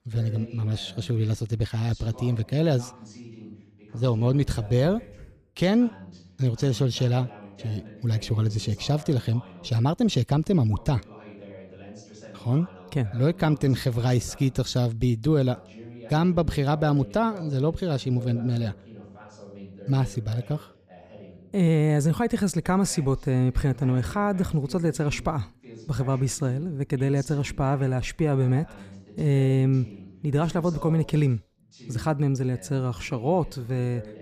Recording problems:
voice in the background; faint; throughout; 20 dB below the speech

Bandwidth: 15 kHz